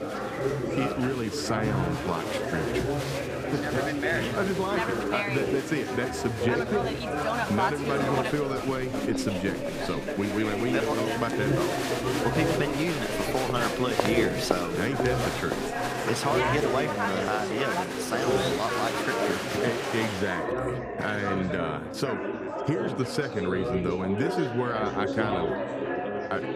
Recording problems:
chatter from many people; very loud; throughout; 1 dB above the speech

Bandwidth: 15 kHz